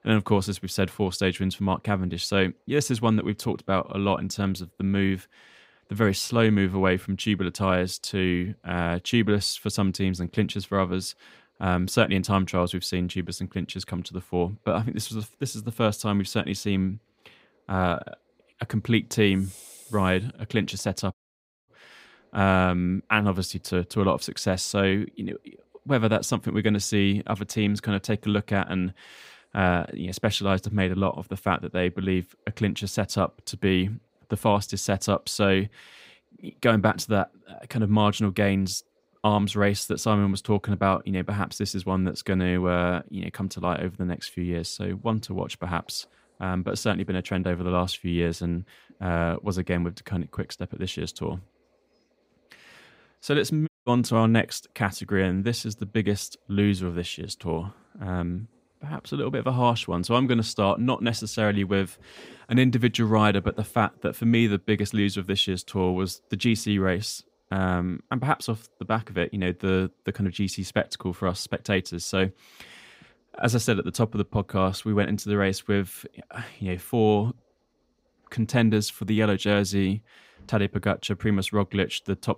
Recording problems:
audio cutting out; at 21 s for 0.5 s and at 54 s

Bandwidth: 15.5 kHz